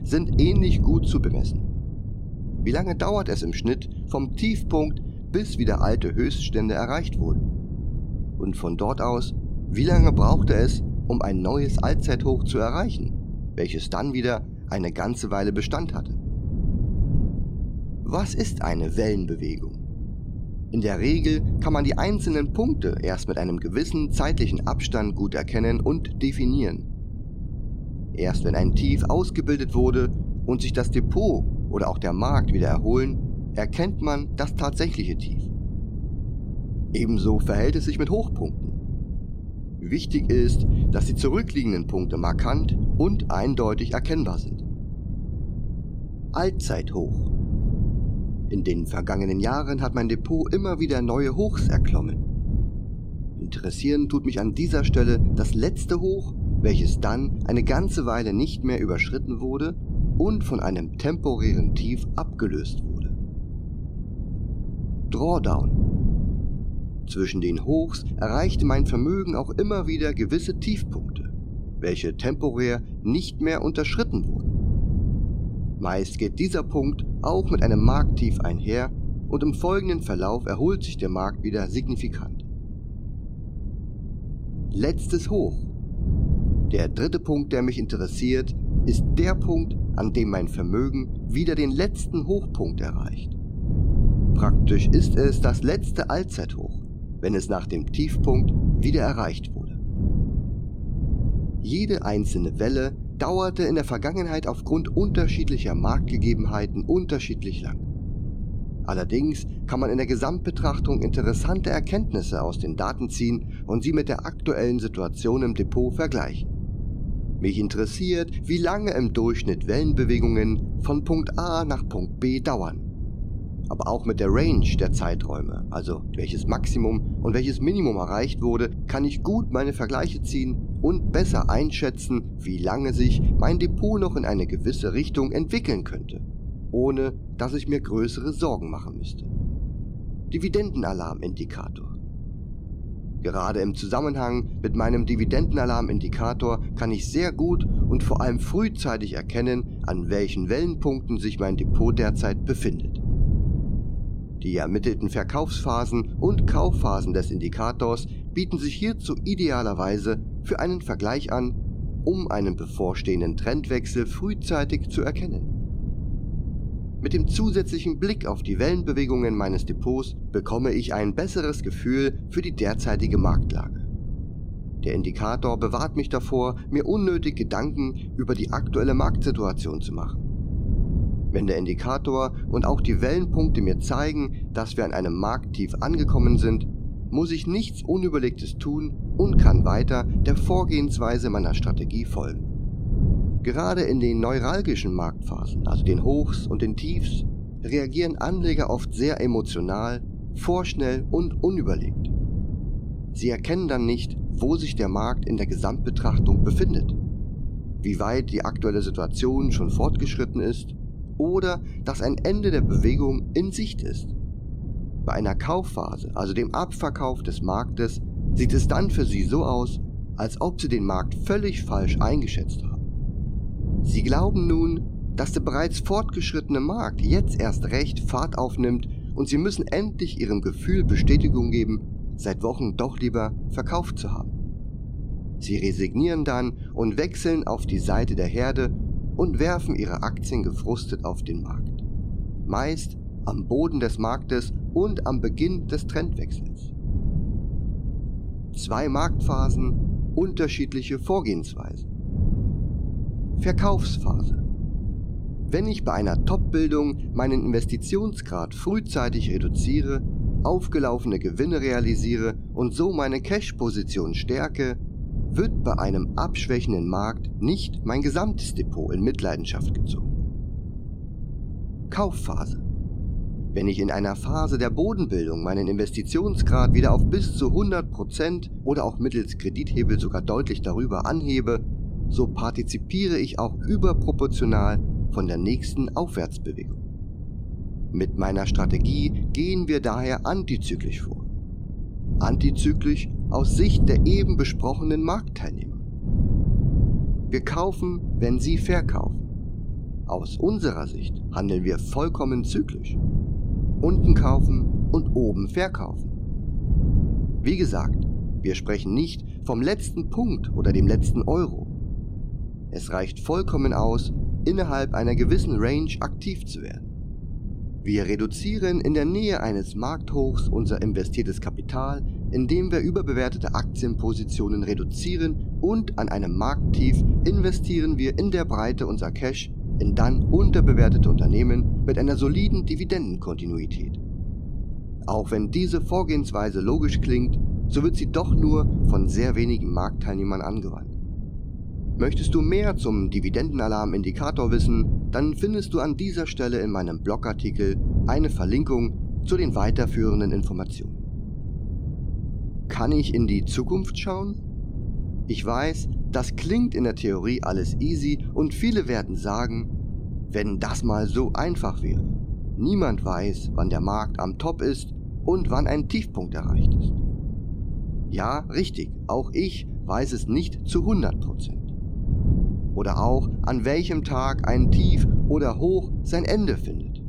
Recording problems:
wind noise on the microphone; occasional gusts; 10 dB below the speech

